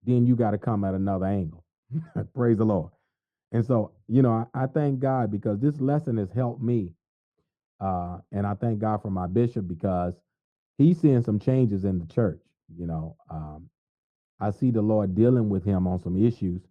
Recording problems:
muffled; very; fading above 1.5 kHz

